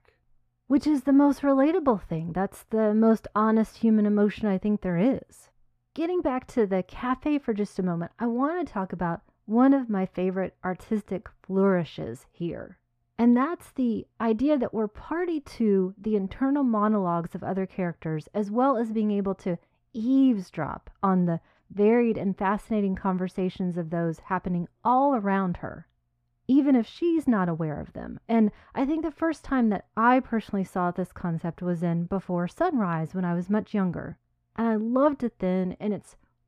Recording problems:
muffled; slightly; fading above 3 kHz

